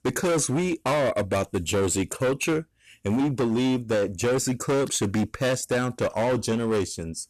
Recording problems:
distortion; heavy; 21% of the sound clipped

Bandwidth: 13.5 kHz